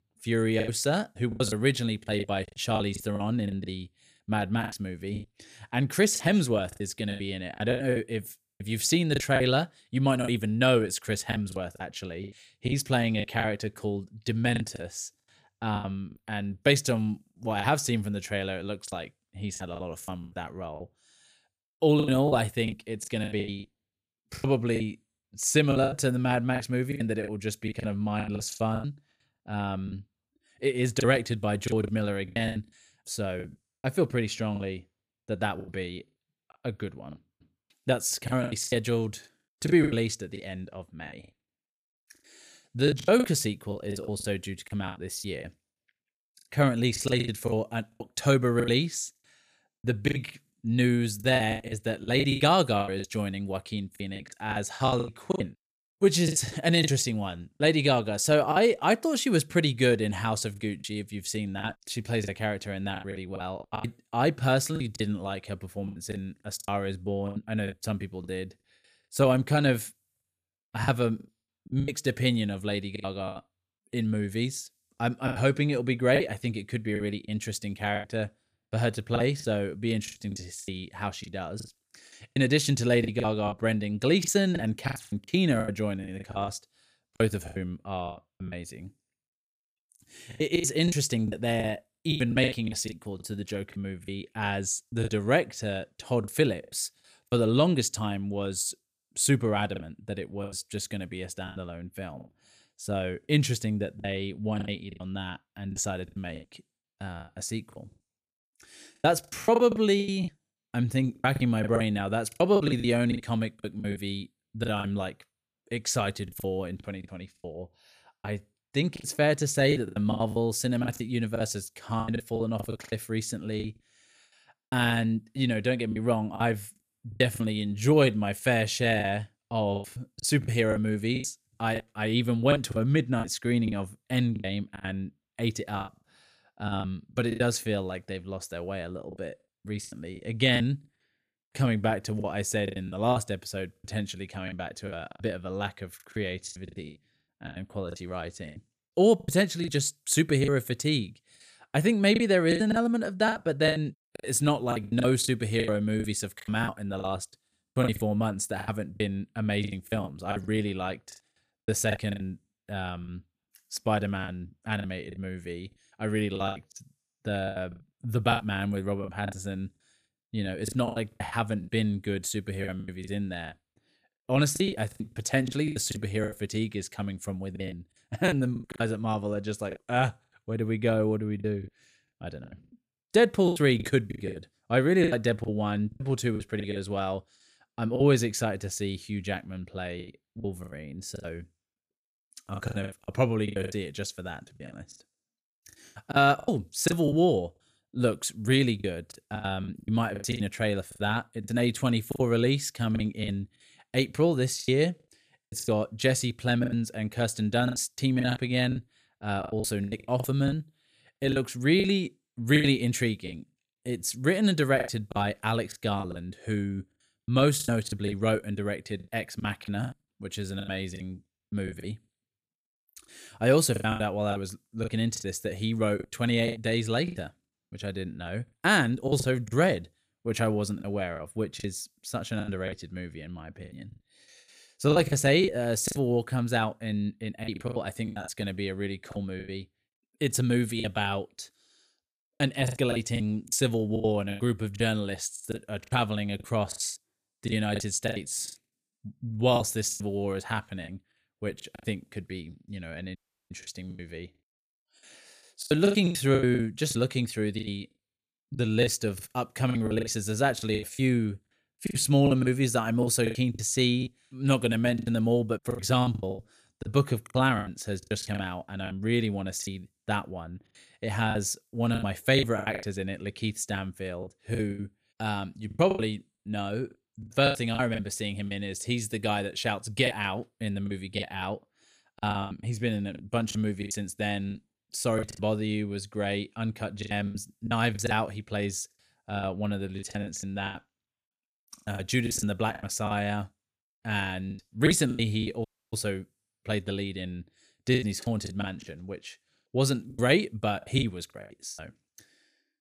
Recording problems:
choppy; very; 13% of the speech affected
audio cutting out; at 4:13 and at 4:56

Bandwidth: 14.5 kHz